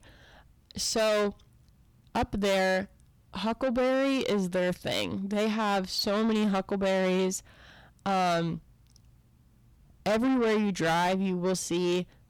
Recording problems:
distortion; heavy; 7 dB below the speech

